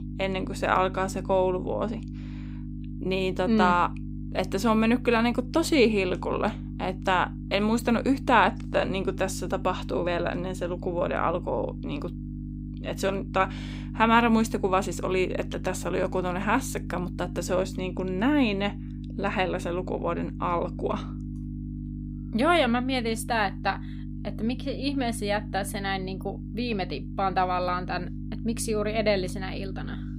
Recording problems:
electrical hum; noticeable; throughout; 50 Hz, 20 dB below the speech

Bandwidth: 15.5 kHz